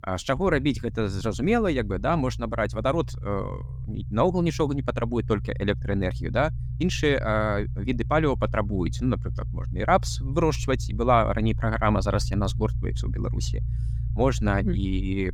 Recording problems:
low rumble; faint; throughout; 20 dB below the speech

